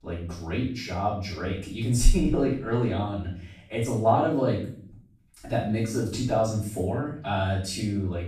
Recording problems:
off-mic speech; far
room echo; noticeable; dies away in 0.5 s

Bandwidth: 14.5 kHz